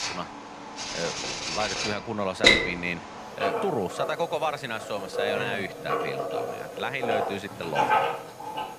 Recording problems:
household noises; very loud; throughout; 4 dB above the speech

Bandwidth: 15 kHz